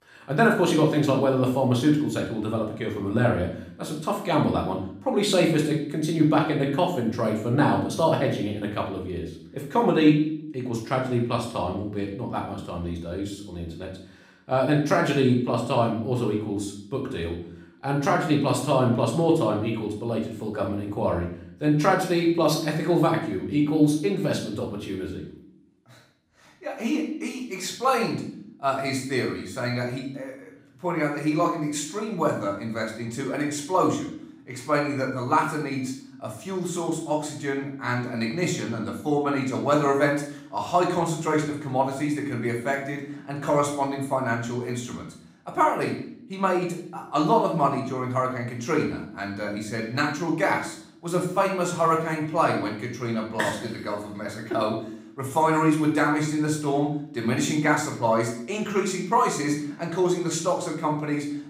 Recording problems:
off-mic speech; far
room echo; noticeable; dies away in 0.6 s

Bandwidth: 15.5 kHz